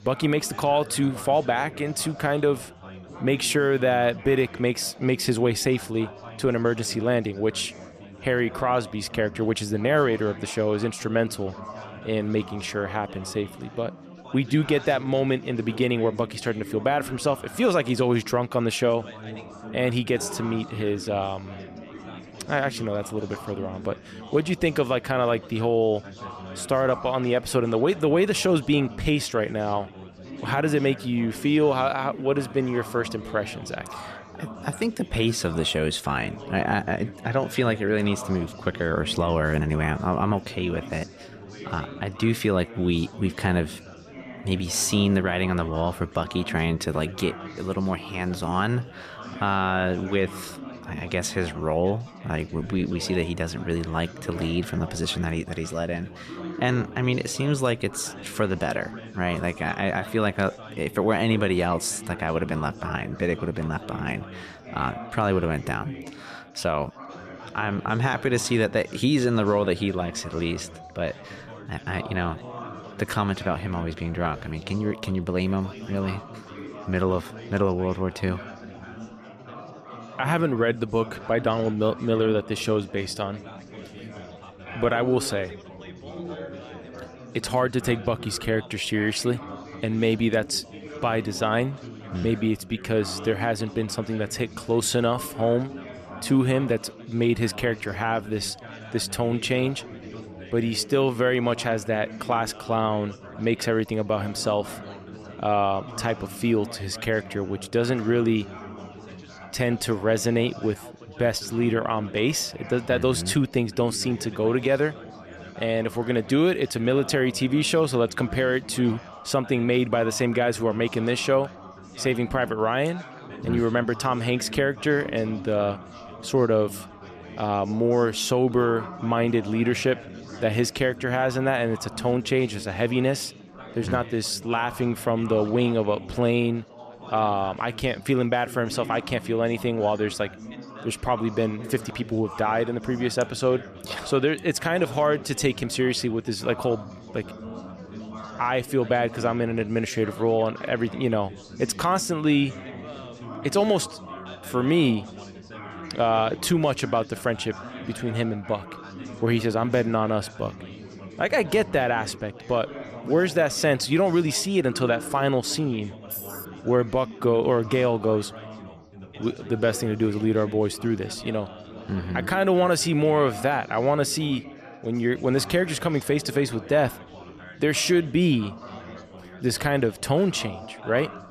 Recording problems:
chatter from many people; noticeable; throughout; 15 dB below the speech
jangling keys; noticeable; at 2:46; peak 8 dB below the speech

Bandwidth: 14.5 kHz